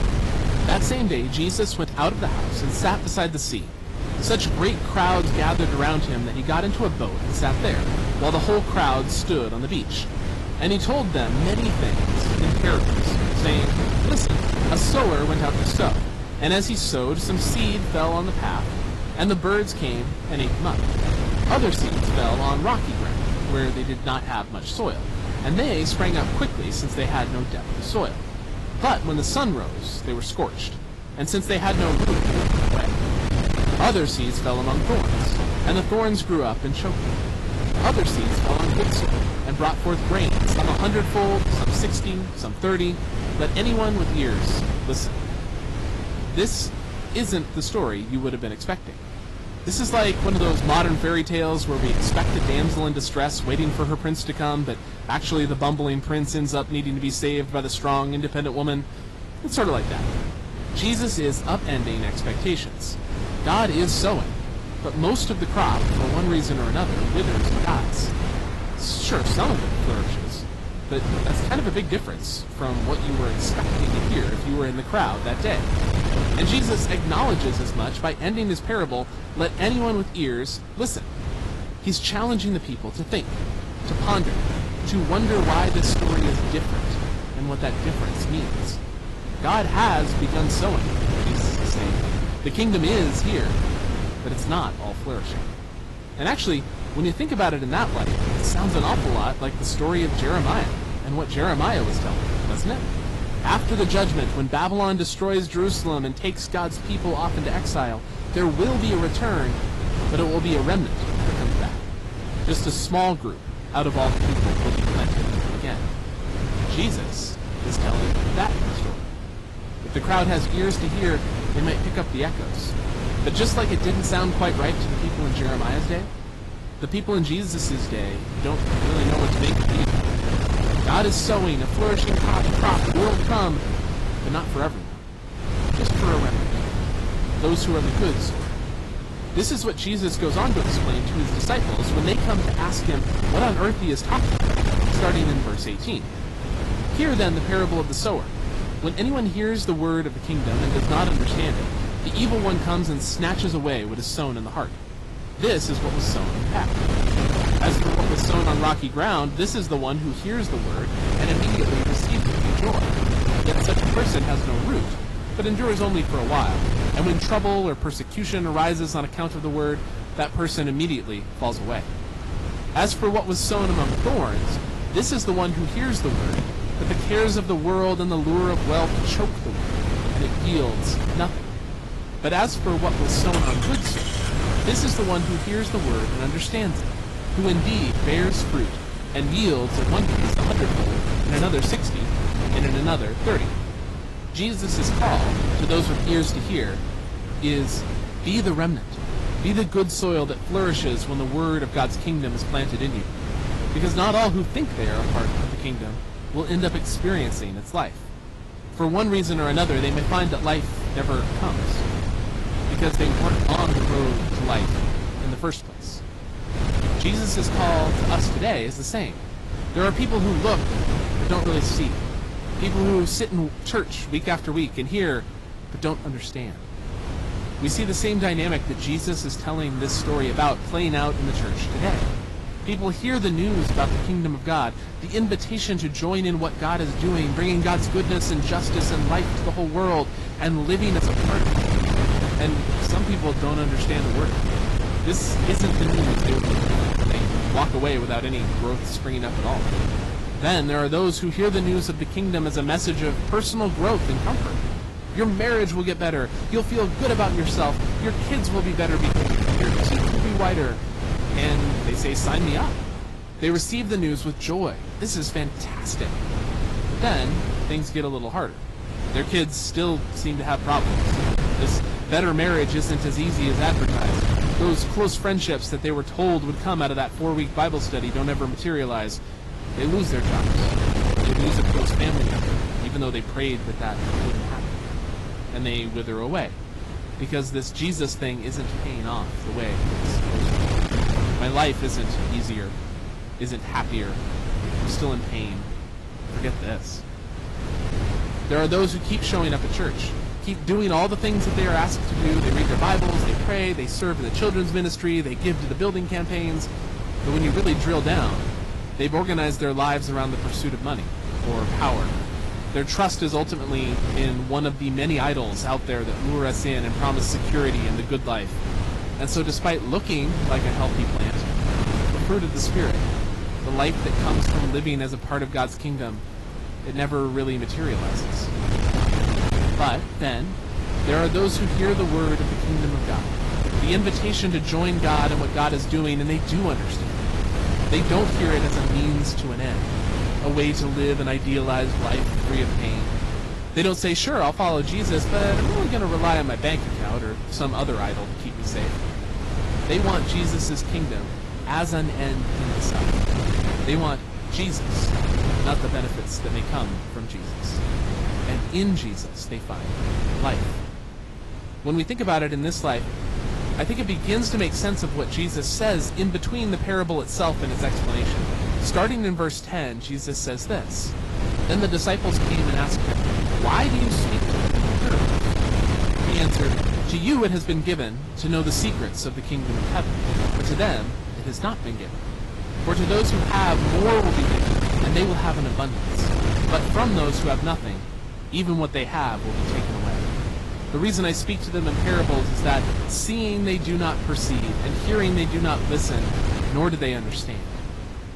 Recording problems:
distortion; slight; 8% of the sound clipped
garbled, watery; slightly; nothing above 11.5 kHz
wind noise on the microphone; heavy; 5 dB below the speech
traffic noise; noticeable; throughout; 20 dB below the speech

